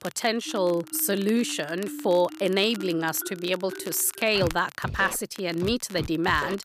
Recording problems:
background music; noticeable; throughout; 15 dB below the speech
crackle, like an old record; faint; 20 dB below the speech

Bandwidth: 14.5 kHz